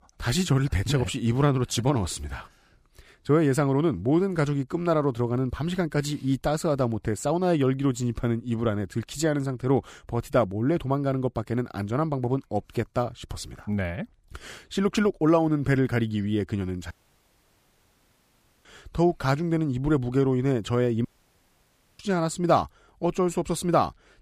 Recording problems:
audio cutting out; at 17 s for 1.5 s and at 21 s for 1 s

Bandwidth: 15 kHz